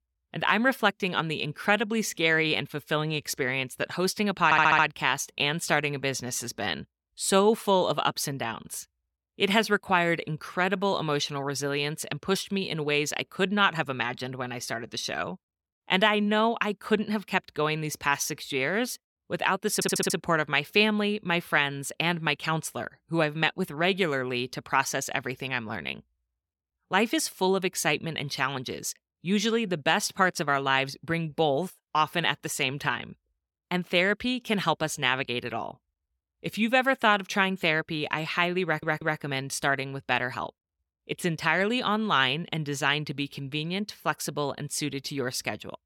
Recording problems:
audio stuttering; at 4.5 s, at 20 s and at 39 s

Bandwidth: 17 kHz